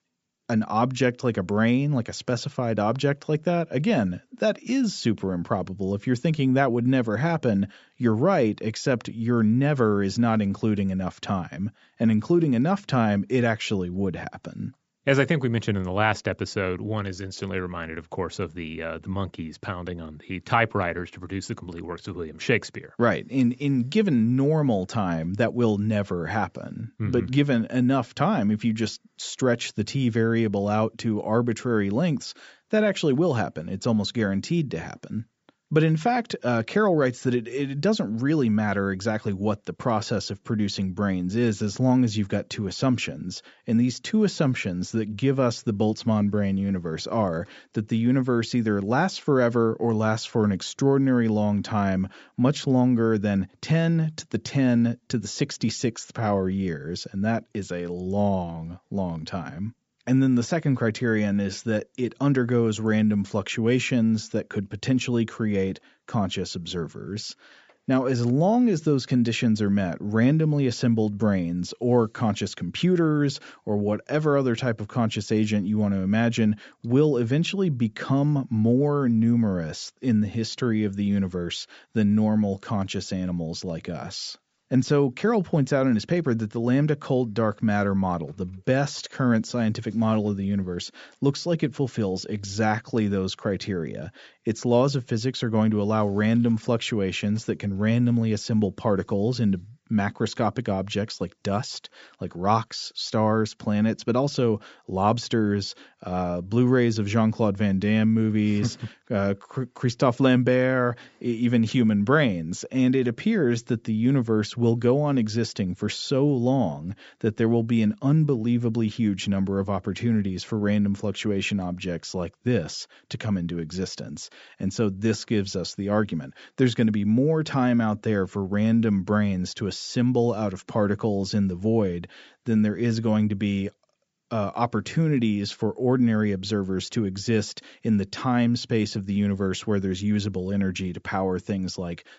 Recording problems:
high frequencies cut off; noticeable; nothing above 8 kHz

